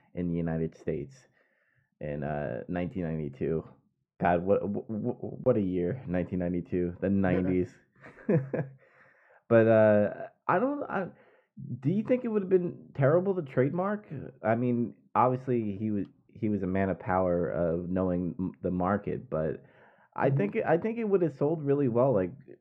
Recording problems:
muffled; very; fading above 3 kHz

